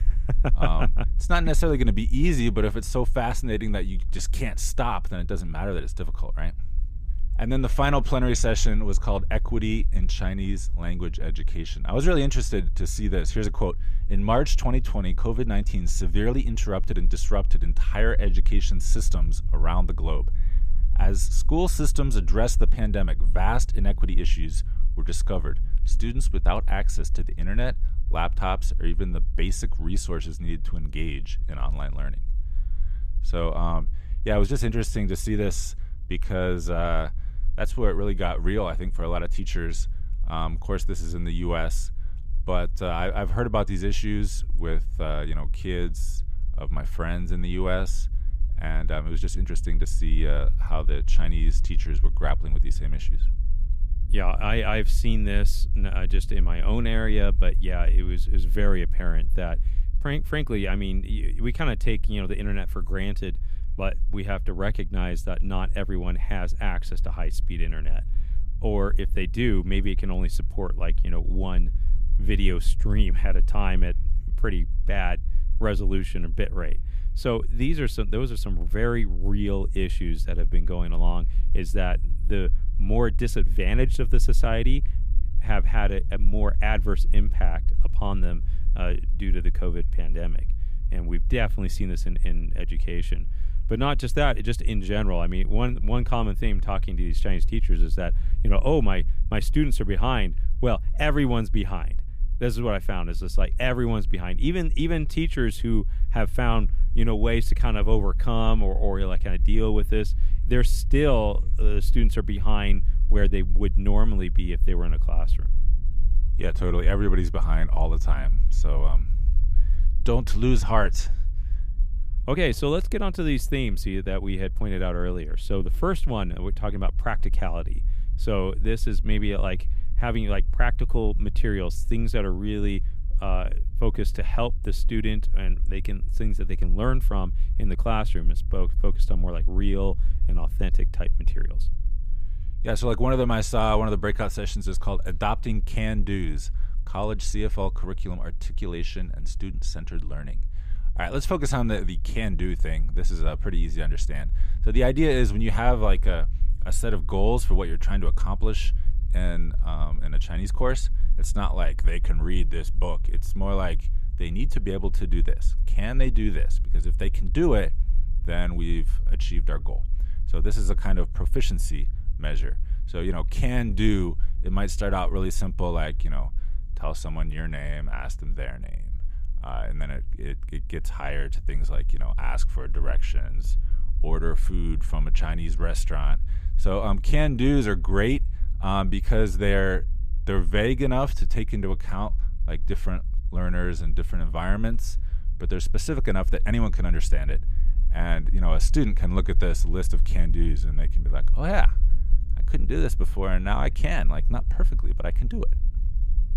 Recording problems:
low rumble; faint; throughout; 20 dB below the speech

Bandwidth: 15 kHz